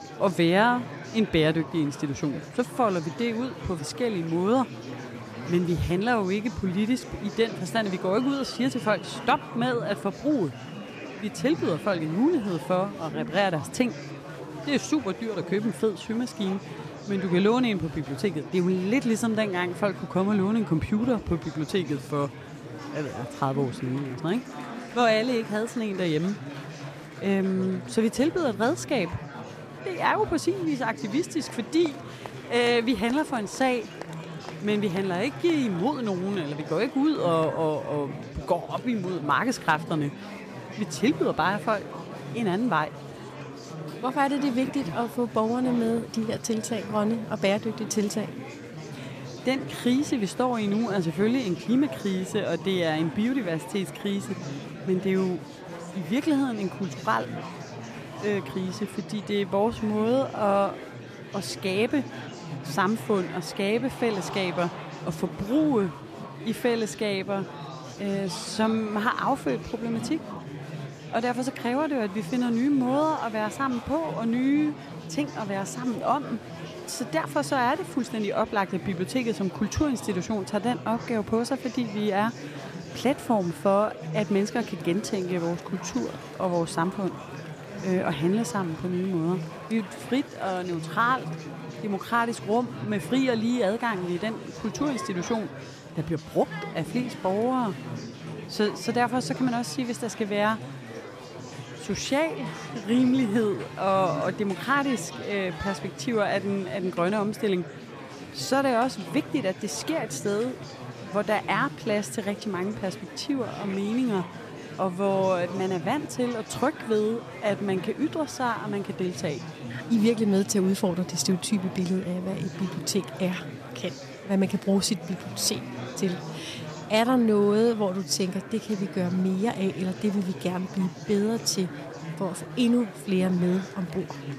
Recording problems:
murmuring crowd; noticeable; throughout; 10 dB below the speech

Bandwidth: 14.5 kHz